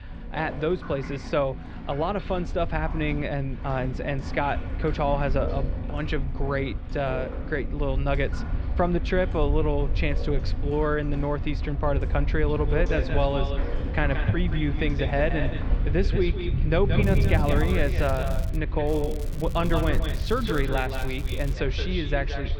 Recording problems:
echo of what is said; strong; from 13 s on; 180 ms later, 8 dB below the speech
muffled; slightly; fading above 3.5 kHz
rain or running water; loud; throughout; 8 dB below the speech
crackling; noticeable; from 17 to 19 s and from 19 to 22 s; 20 dB below the speech
low rumble; faint; throughout; 20 dB below the speech

